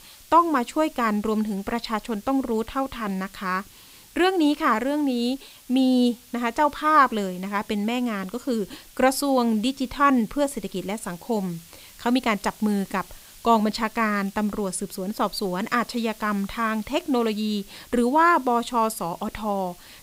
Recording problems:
hiss; faint; throughout; 25 dB below the speech

